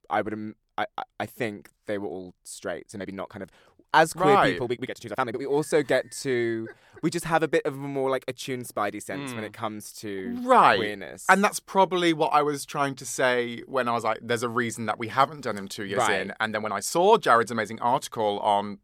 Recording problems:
uneven, jittery; strongly; from 2.5 to 17 s

